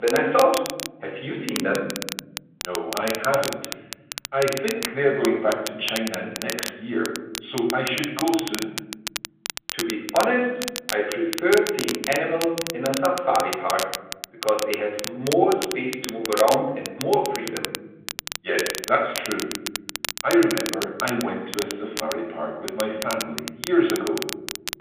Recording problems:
off-mic speech; far
room echo; noticeable; dies away in 1.1 s
phone-call audio; nothing above 3.5 kHz
crackle, like an old record; loud; 7 dB below the speech
abrupt cut into speech; at the start

